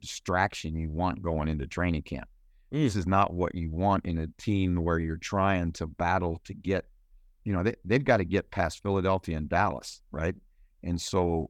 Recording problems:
none

